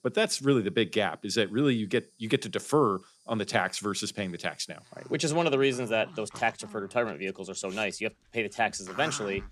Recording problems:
animal sounds; noticeable; throughout; 20 dB below the speech

